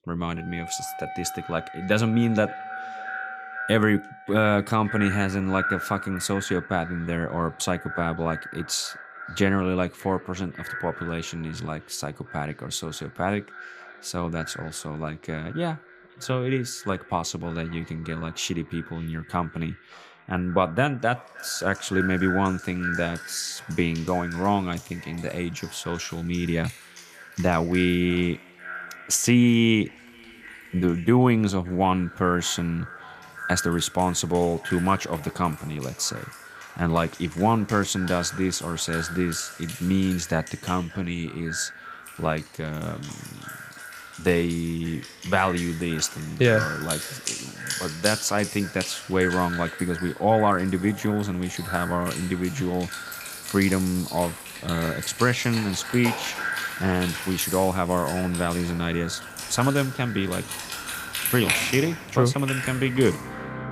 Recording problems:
echo of what is said; noticeable; throughout; 570 ms later, 10 dB below the speech
background music; loud; throughout; 10 dB below the speech

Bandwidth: 15 kHz